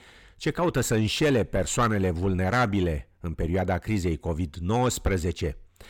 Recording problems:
distortion; slight; 10 dB below the speech

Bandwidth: 18 kHz